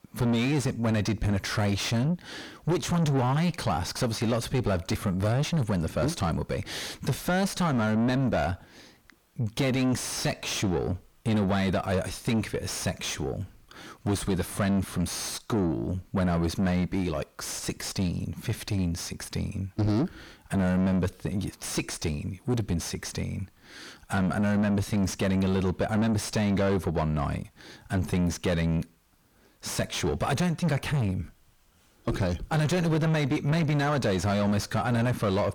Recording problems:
distortion; heavy; 6 dB below the speech

